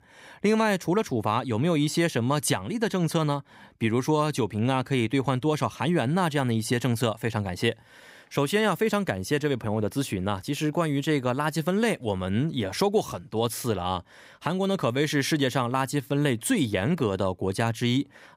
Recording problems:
none

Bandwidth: 15.5 kHz